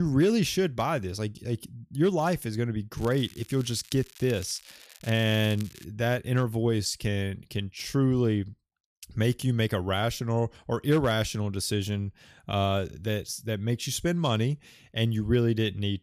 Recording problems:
crackling; faint; from 3 to 6 s; 20 dB below the speech
abrupt cut into speech; at the start

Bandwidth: 14.5 kHz